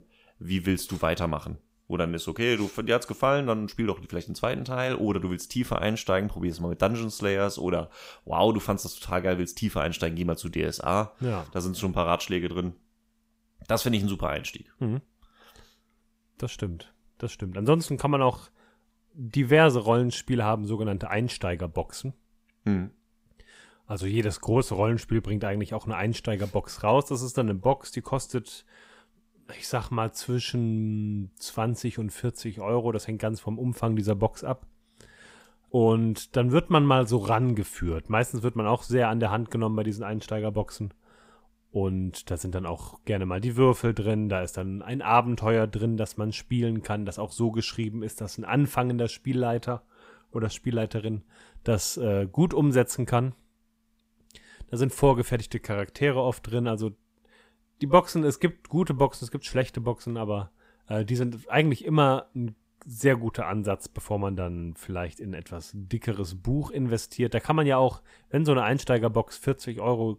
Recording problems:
none

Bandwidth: 15.5 kHz